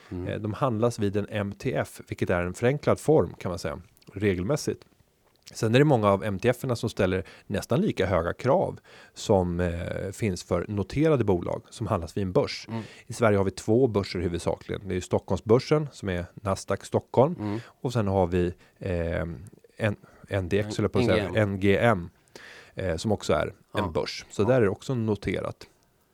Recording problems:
none

